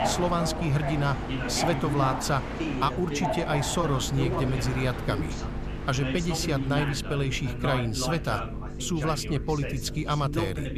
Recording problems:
train or aircraft noise; loud; throughout; 7 dB below the speech
voice in the background; loud; throughout; 6 dB below the speech
electrical hum; noticeable; throughout; 50 Hz, 15 dB below the speech

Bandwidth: 14.5 kHz